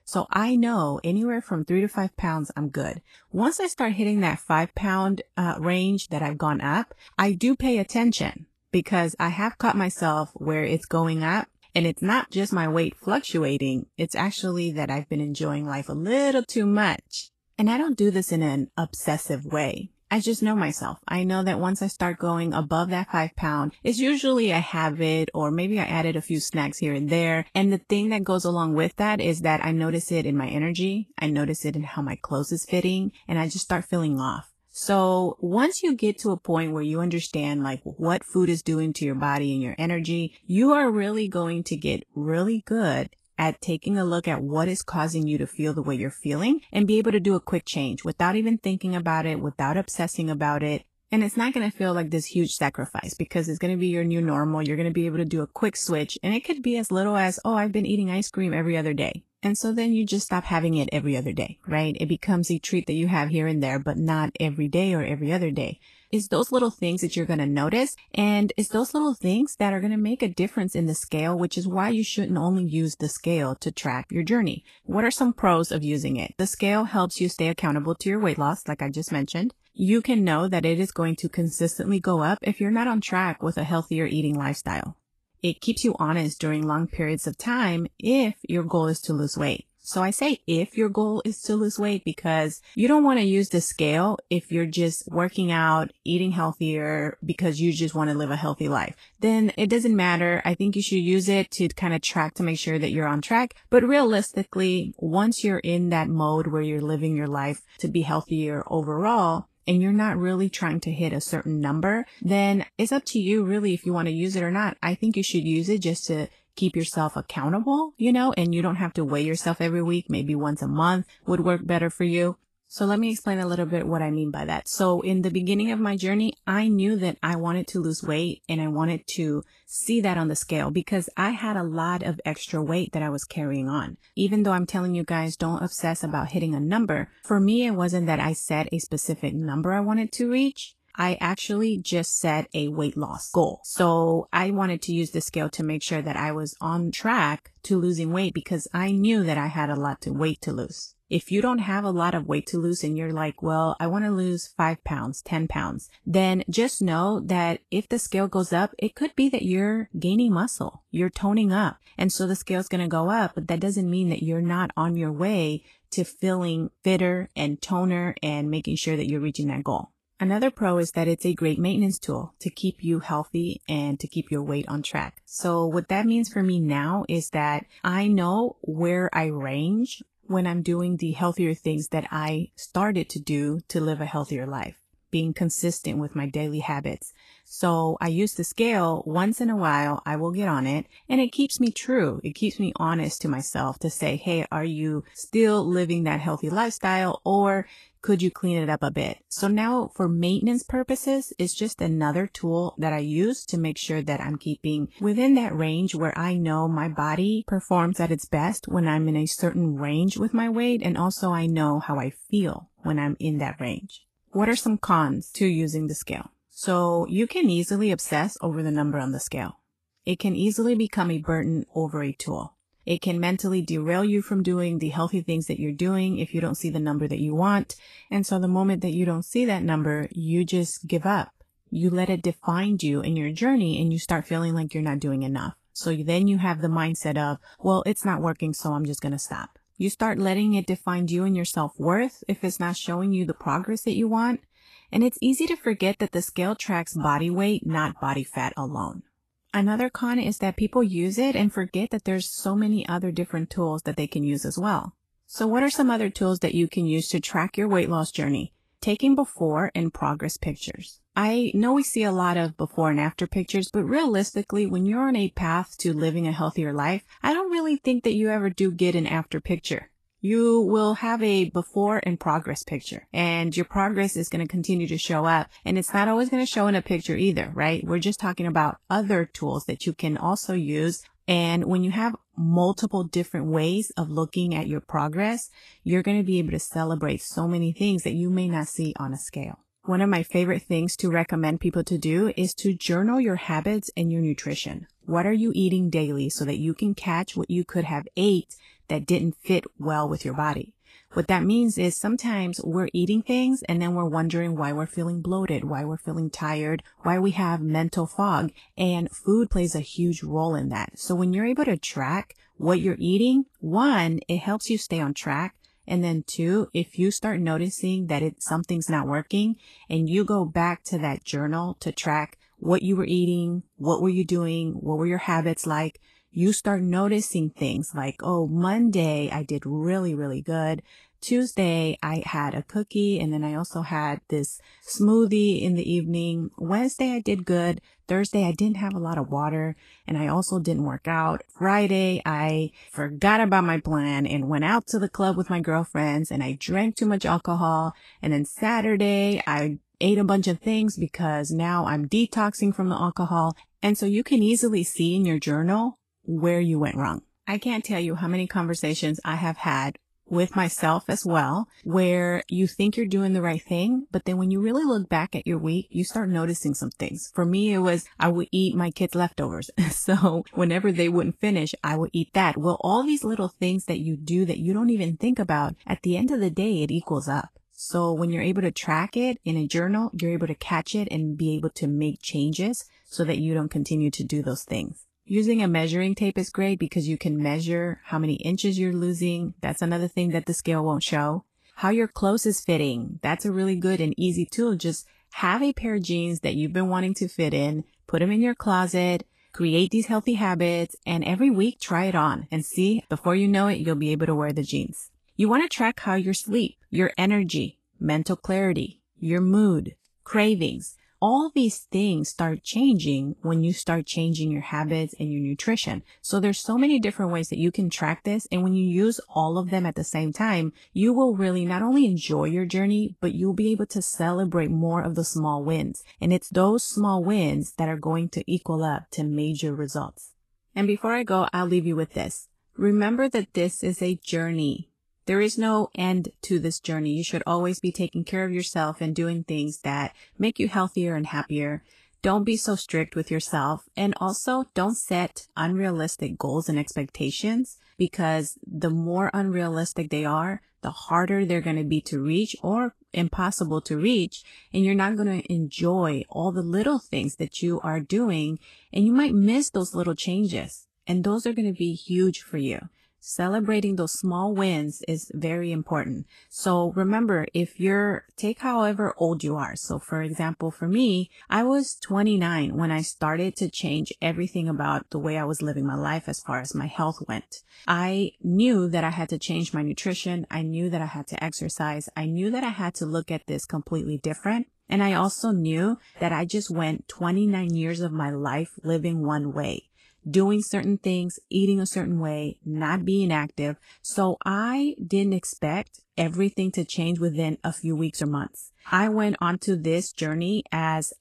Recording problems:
garbled, watery; slightly; nothing above 12.5 kHz

